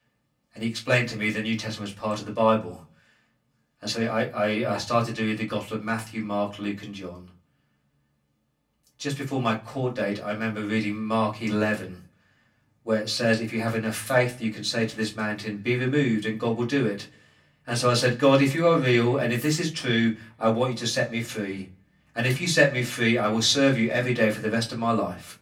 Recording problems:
off-mic speech; far
room echo; very slight; dies away in 0.2 s

